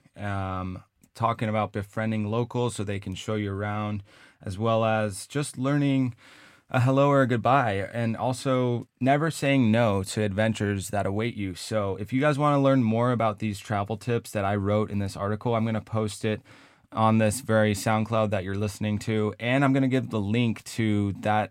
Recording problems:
none

